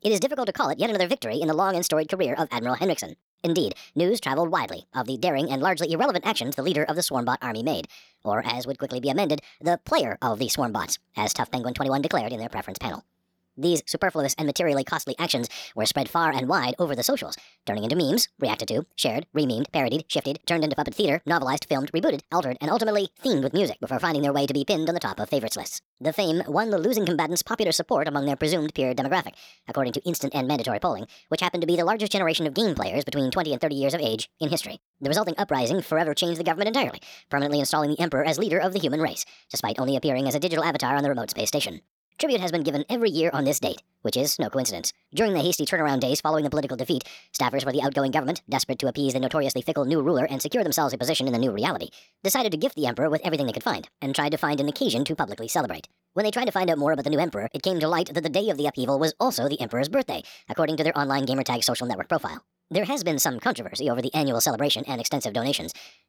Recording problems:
wrong speed and pitch; too fast and too high; 1.5 times normal speed

